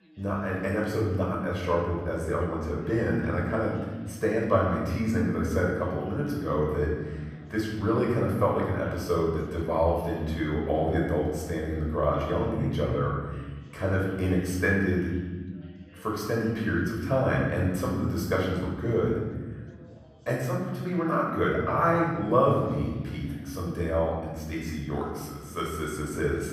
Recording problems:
off-mic speech; far
room echo; noticeable; dies away in 1.5 s
background chatter; faint; throughout; 2 voices, 30 dB below the speech

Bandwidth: 15 kHz